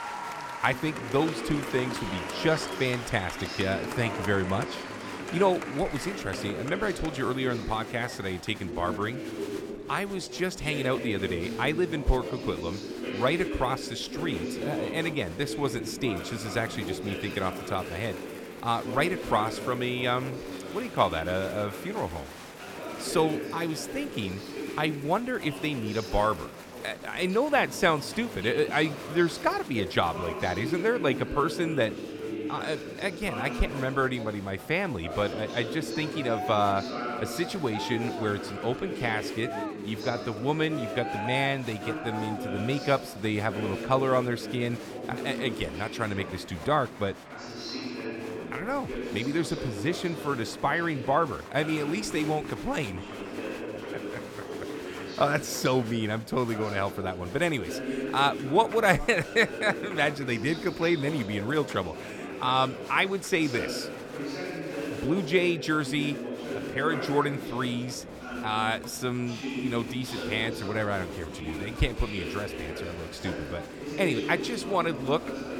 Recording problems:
murmuring crowd; loud; throughout; 7 dB below the speech

